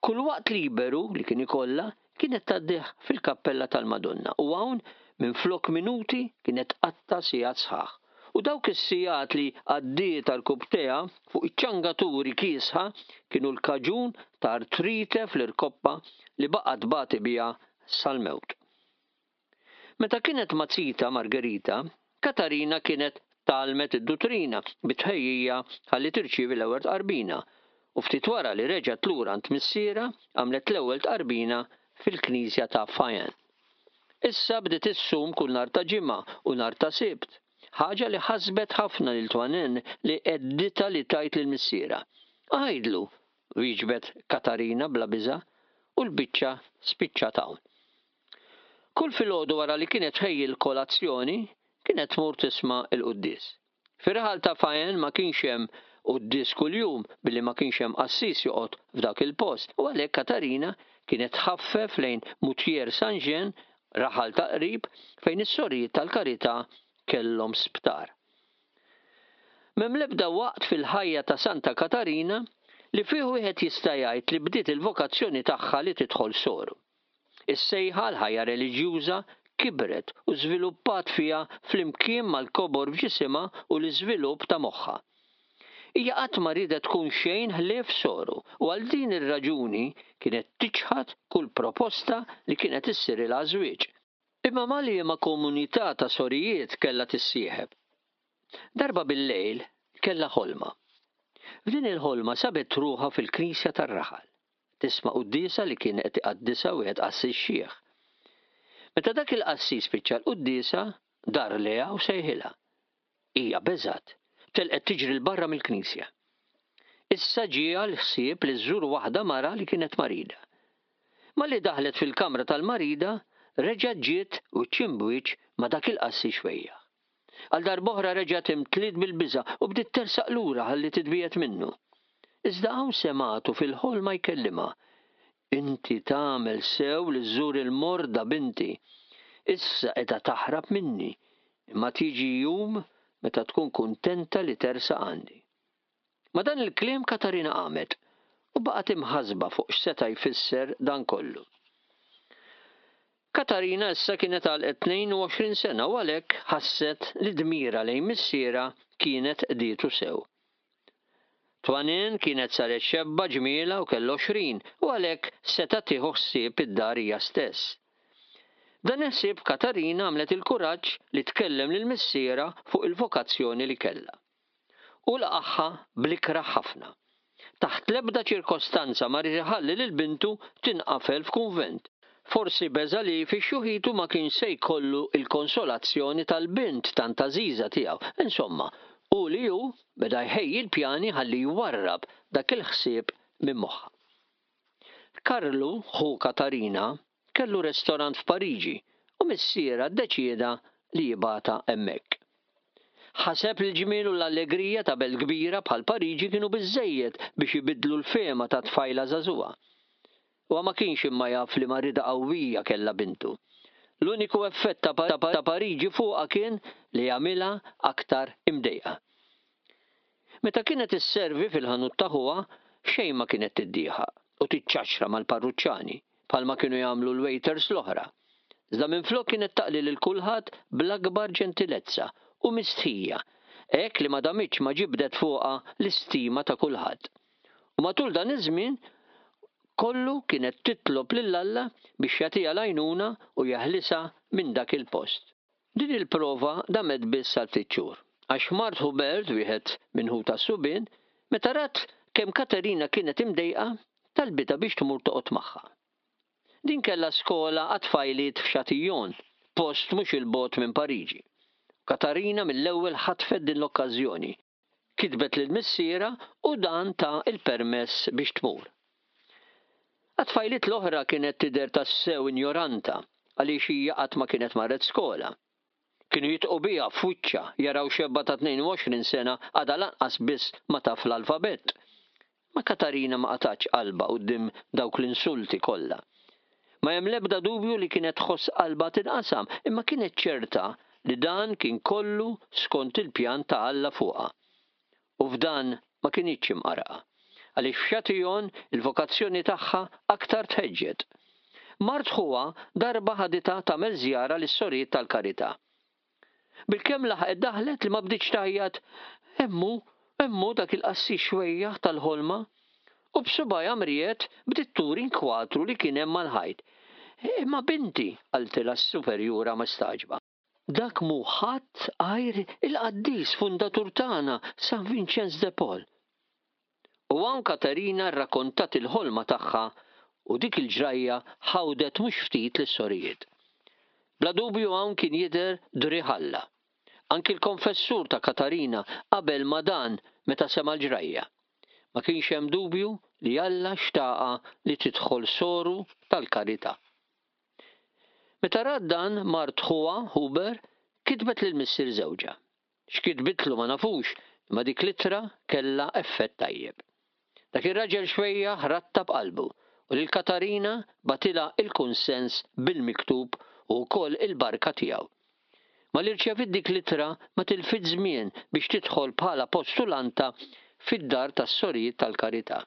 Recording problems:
squashed, flat; heavily
high frequencies cut off; noticeable; nothing above 5.5 kHz
muffled; very slightly; fading above 4.5 kHz
thin; very slightly; fading below 300 Hz
audio stuttering; at 3:35

